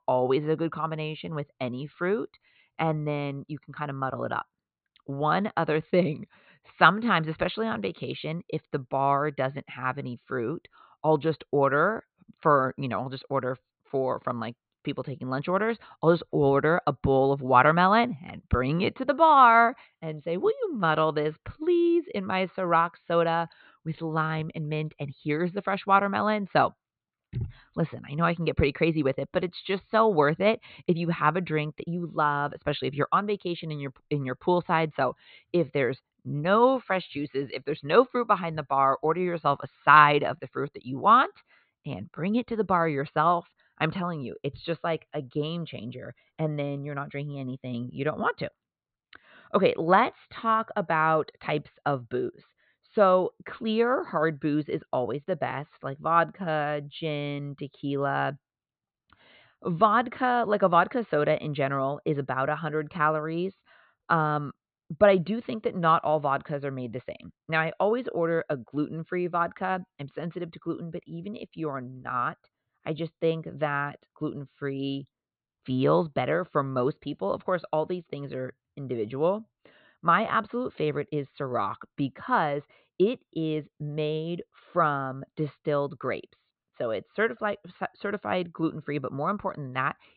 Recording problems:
high frequencies cut off; severe; nothing above 4 kHz

